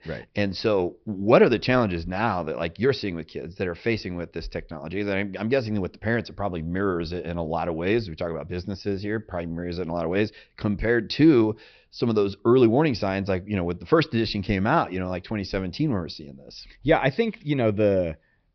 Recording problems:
high frequencies cut off; noticeable; nothing above 5.5 kHz

